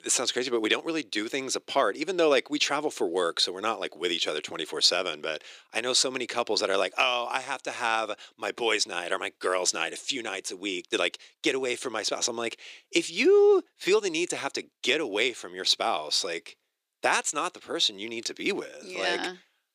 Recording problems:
thin; very; fading below 350 Hz

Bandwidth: 15 kHz